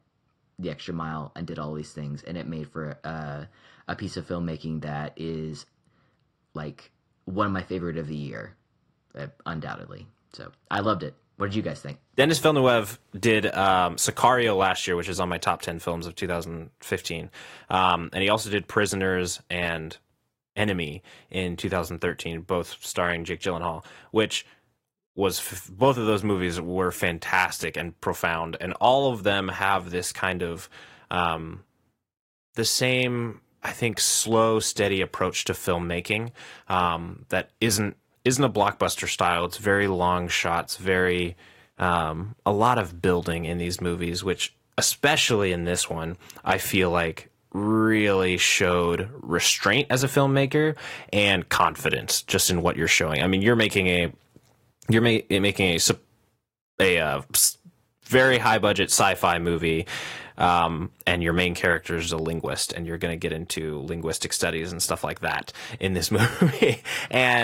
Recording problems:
garbled, watery; slightly; nothing above 15.5 kHz
abrupt cut into speech; at the end

